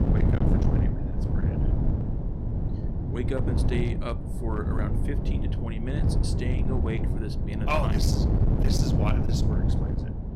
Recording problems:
distortion; slight; 10% of the sound clipped
wind noise on the microphone; heavy; 2 dB below the speech

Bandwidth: 16 kHz